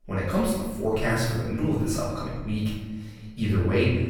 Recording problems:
off-mic speech; far
room echo; noticeable; dies away in 1.2 s

